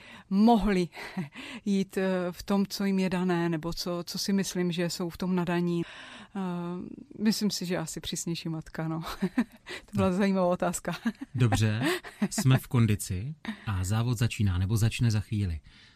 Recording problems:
none

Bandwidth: 15 kHz